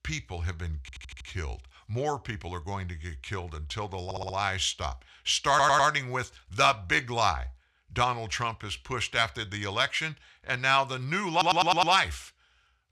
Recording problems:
audio stuttering; 4 times, first at 1 s

